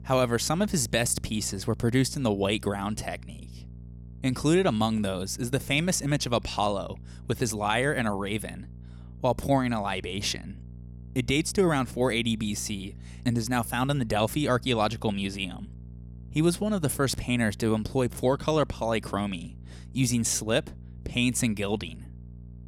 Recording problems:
electrical hum; faint; throughout; 60 Hz, 30 dB below the speech

